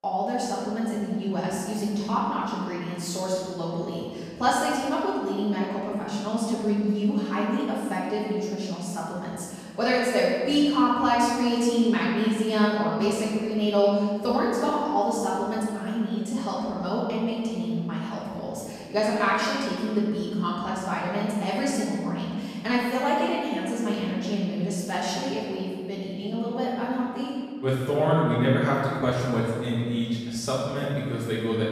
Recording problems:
room echo; strong; dies away in 1.8 s
off-mic speech; far

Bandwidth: 14.5 kHz